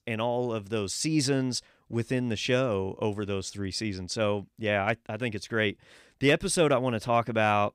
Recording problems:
none

